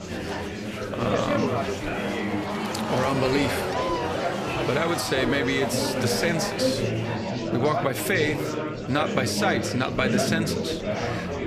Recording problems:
chatter from many people; loud; throughout; 1 dB below the speech

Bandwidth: 14.5 kHz